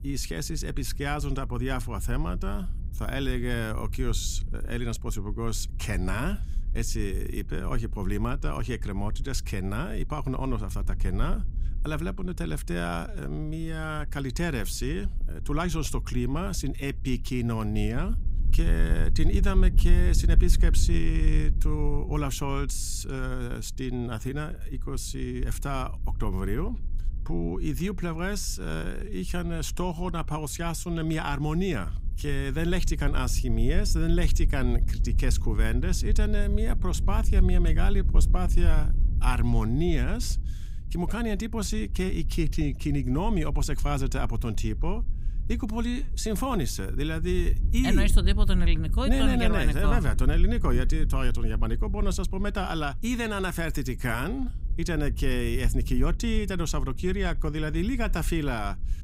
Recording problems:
low rumble; noticeable; throughout; 15 dB below the speech

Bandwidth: 15.5 kHz